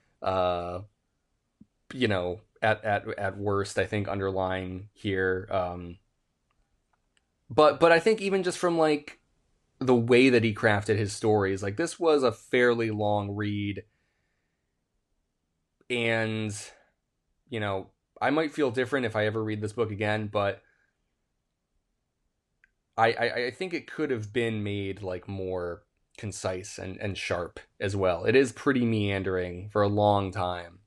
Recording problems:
none

